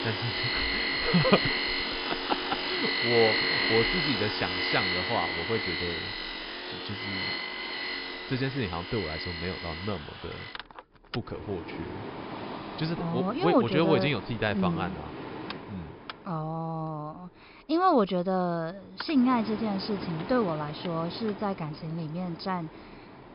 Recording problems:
high frequencies cut off; noticeable; nothing above 5.5 kHz
machinery noise; loud; throughout; 2 dB below the speech

